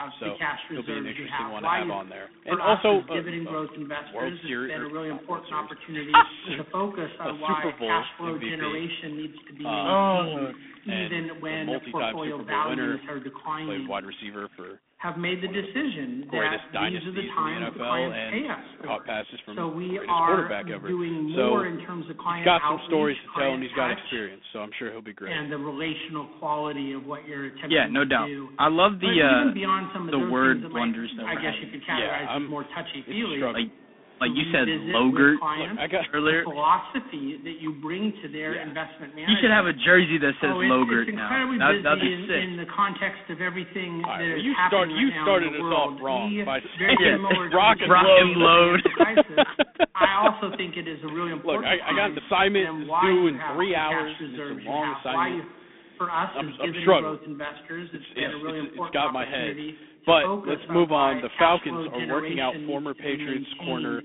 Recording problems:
phone-call audio; poor line; nothing above 3.5 kHz
voice in the background; loud; throughout; 6 dB below the speech
rain or running water; faint; throughout; 20 dB below the speech

